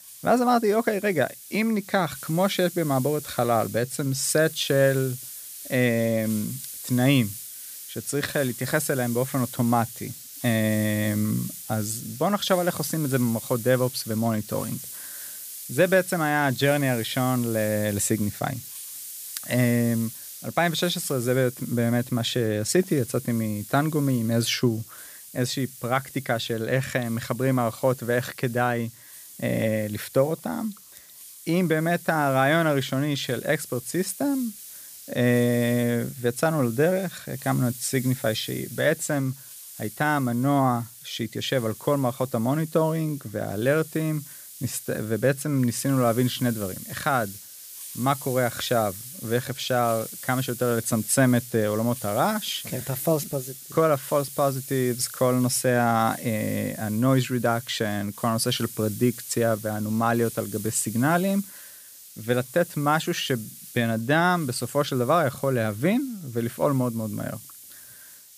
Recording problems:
hiss; noticeable; throughout; 15 dB below the speech

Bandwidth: 15 kHz